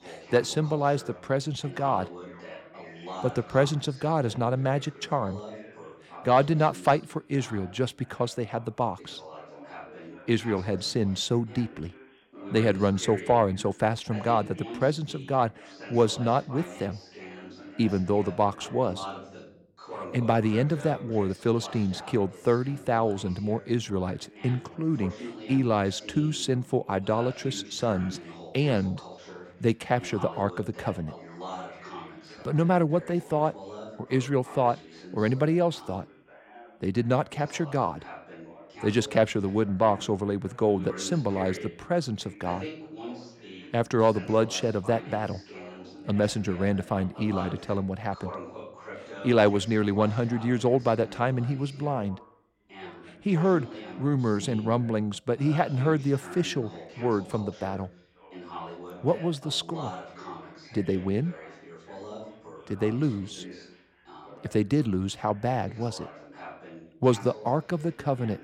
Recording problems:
background chatter; noticeable; throughout; 2 voices, 15 dB below the speech

